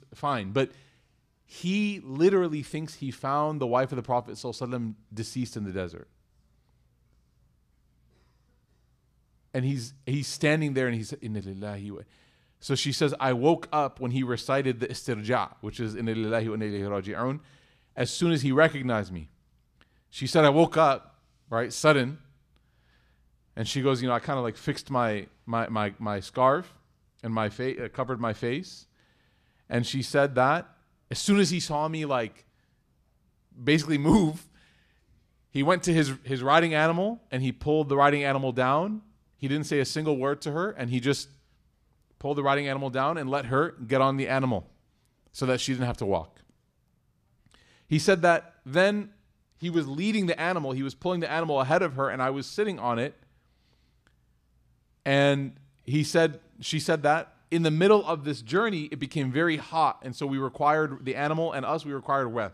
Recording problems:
none

